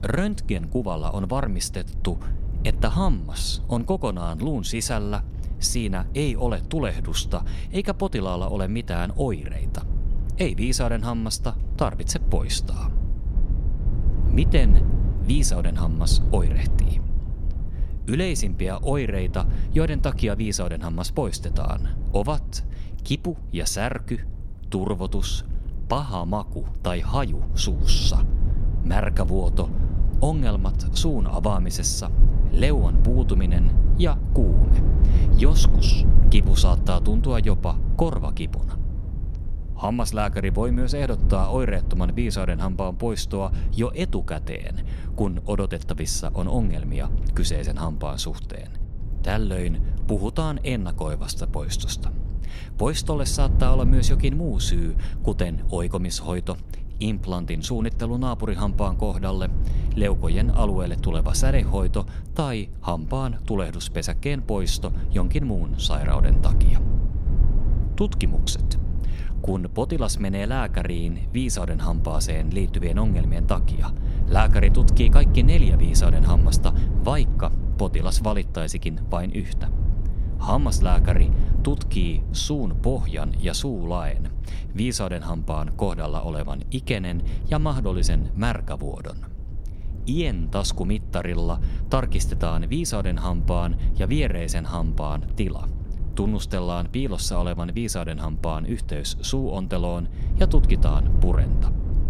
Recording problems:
low rumble; noticeable; throughout; 10 dB below the speech

